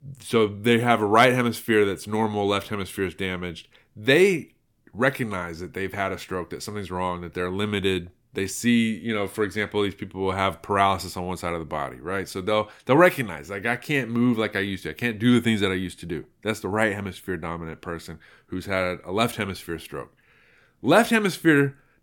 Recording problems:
none

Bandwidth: 17 kHz